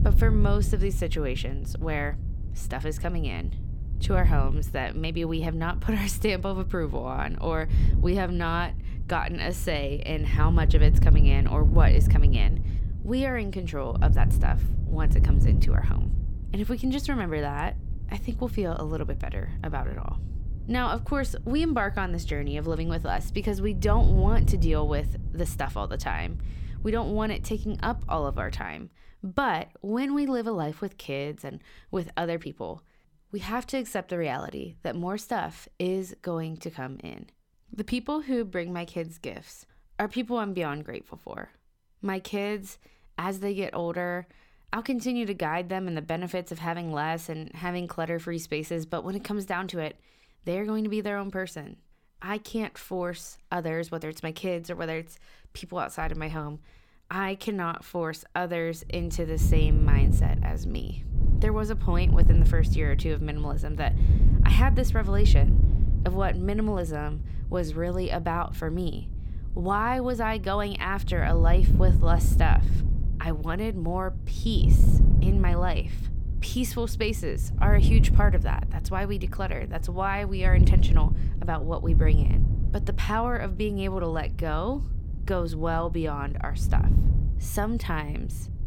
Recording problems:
wind noise on the microphone; occasional gusts; until 29 s and from 59 s on; 10 dB below the speech

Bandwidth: 17.5 kHz